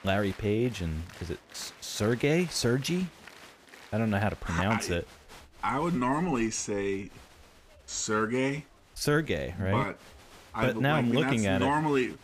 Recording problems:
crowd noise; faint; throughout; 20 dB below the speech

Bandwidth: 15 kHz